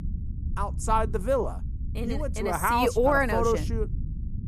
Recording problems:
low rumble; faint; throughout; 25 dB below the speech

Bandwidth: 14.5 kHz